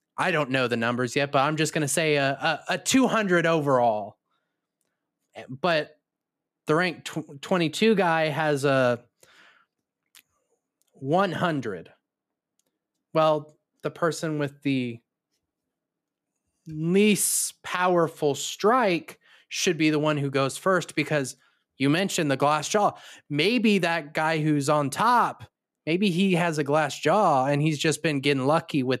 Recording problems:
none

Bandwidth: 14.5 kHz